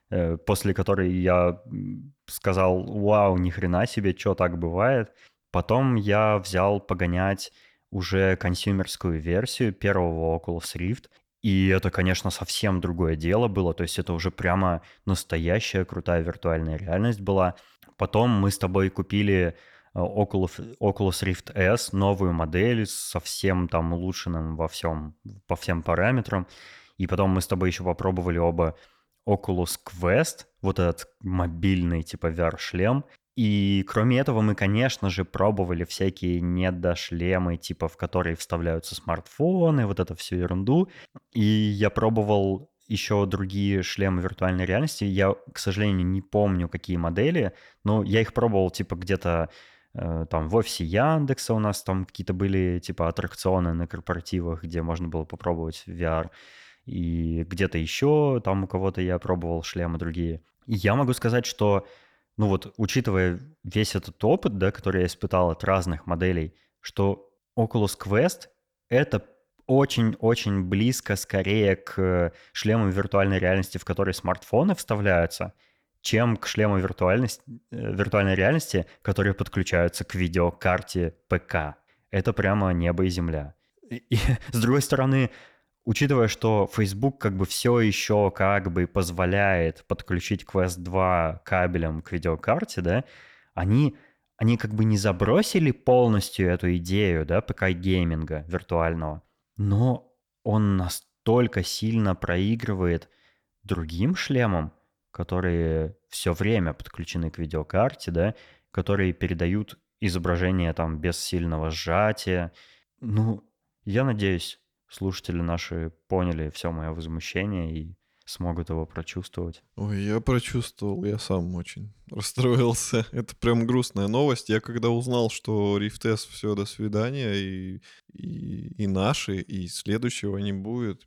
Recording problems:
none

